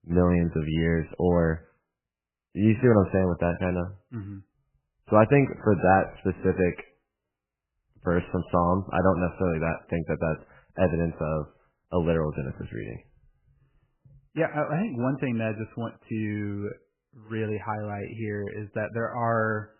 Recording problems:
garbled, watery; badly; nothing above 3 kHz

